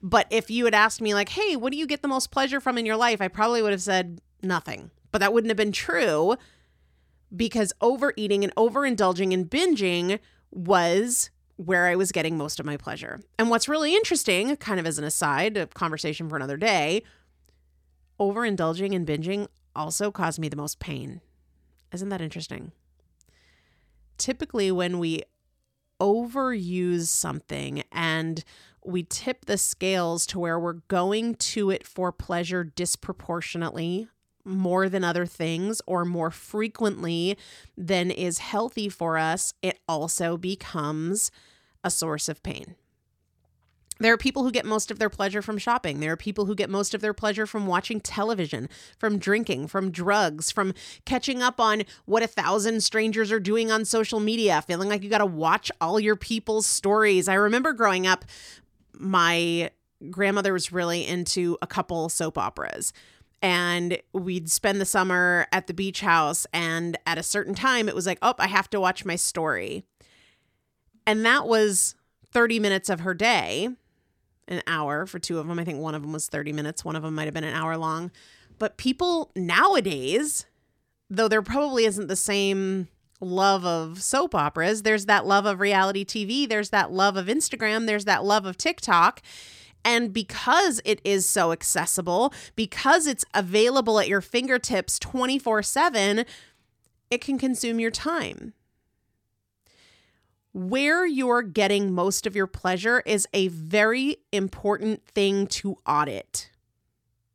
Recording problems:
none

